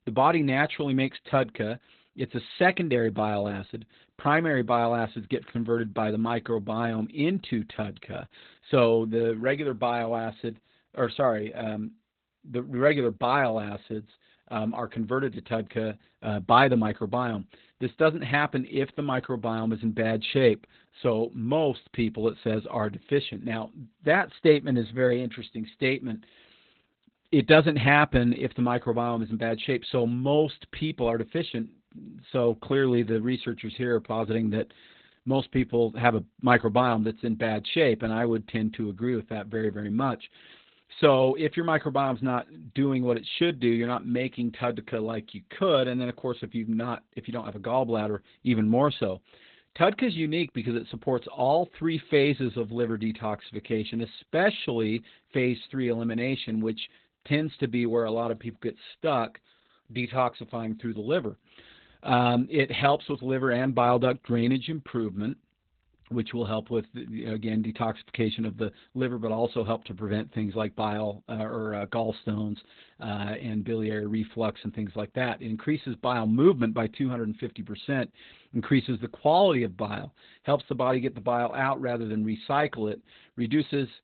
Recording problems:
garbled, watery; badly; nothing above 4 kHz

